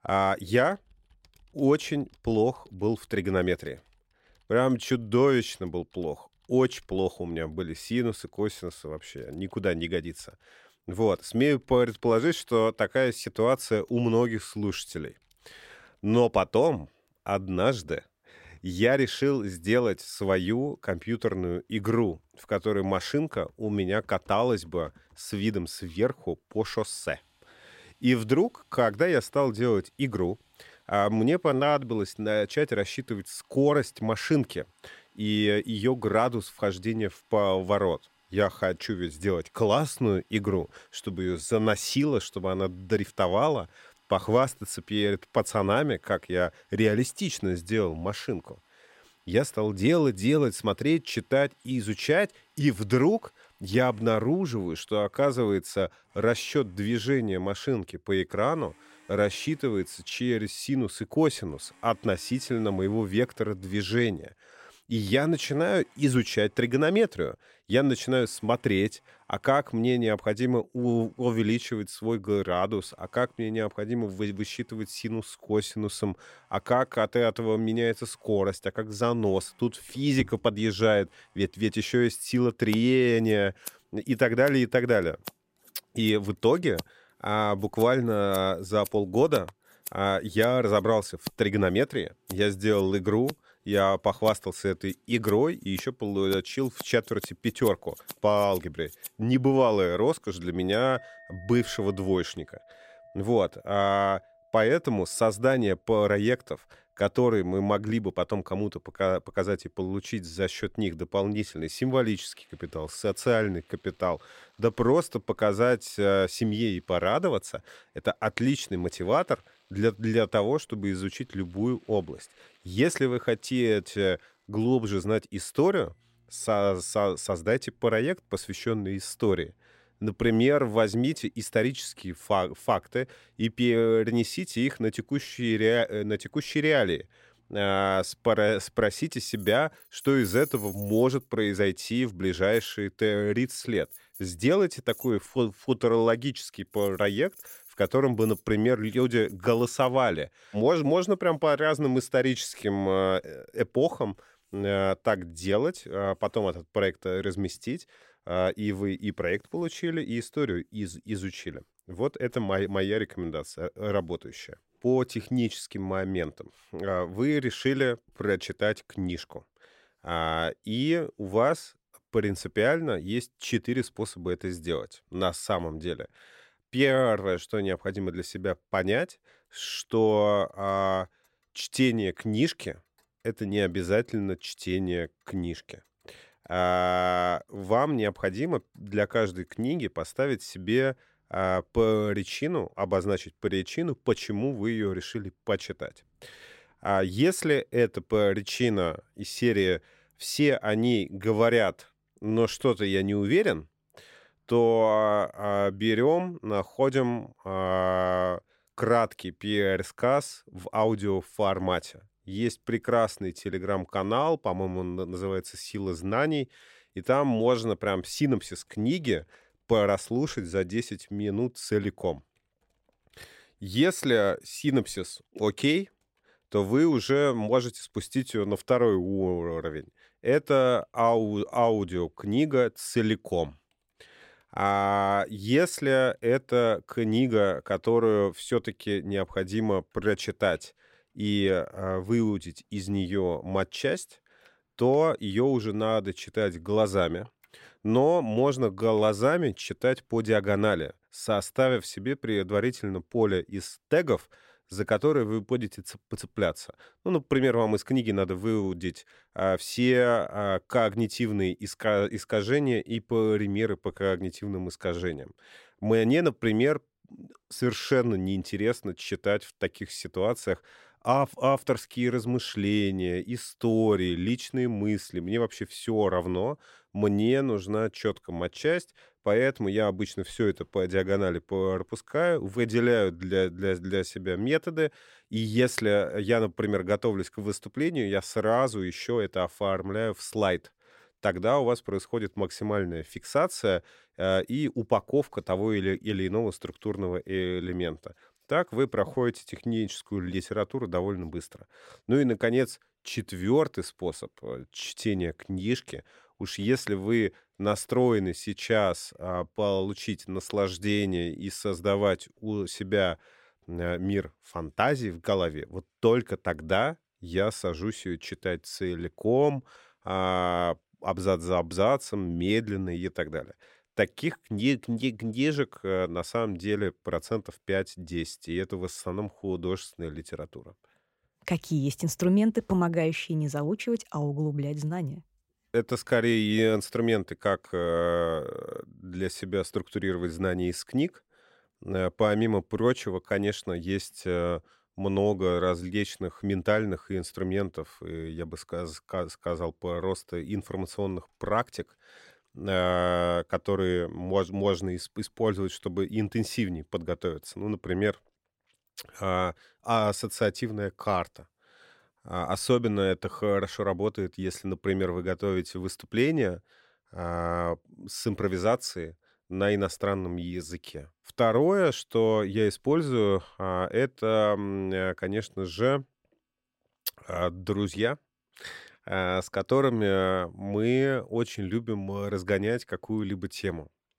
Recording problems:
household noises; faint; throughout; 25 dB below the speech

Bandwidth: 16 kHz